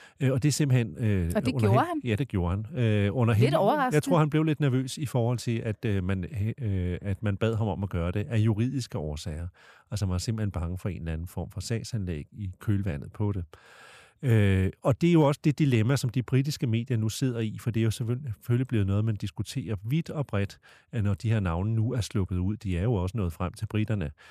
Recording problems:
none

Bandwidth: 14.5 kHz